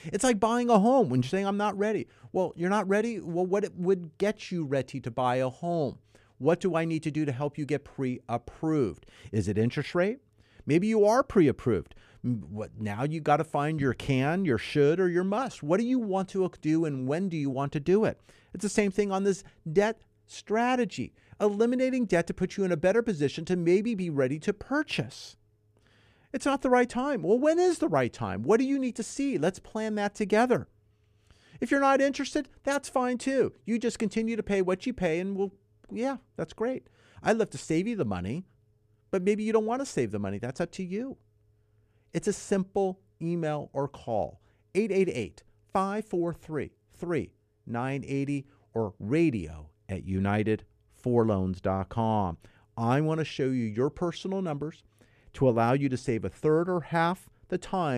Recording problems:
abrupt cut into speech; at the end

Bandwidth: 14.5 kHz